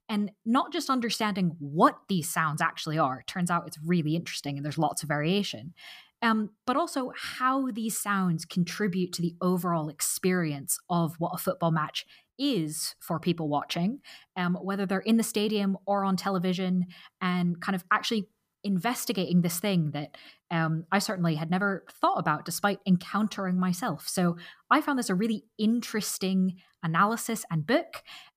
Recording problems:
none

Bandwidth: 15 kHz